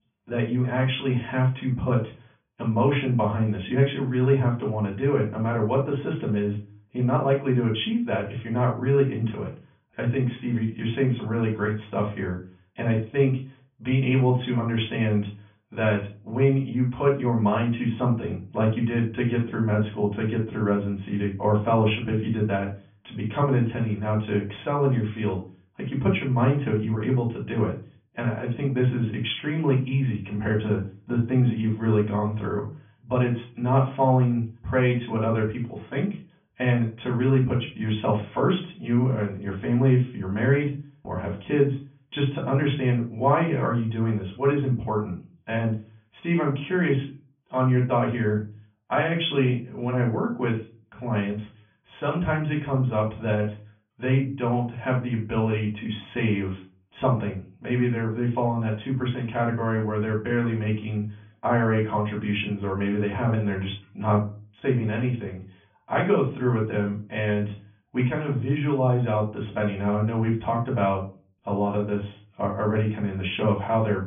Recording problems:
off-mic speech; far
high frequencies cut off; severe; nothing above 3.5 kHz
room echo; slight; dies away in 0.3 s

